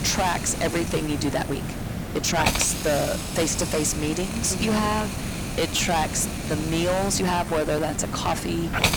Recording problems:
distortion; heavy; 12% of the sound clipped
hiss; loud; throughout; 4 dB below the speech
rain or running water; very faint; throughout; 25 dB below the speech
uneven, jittery; strongly; from 0.5 to 8 s

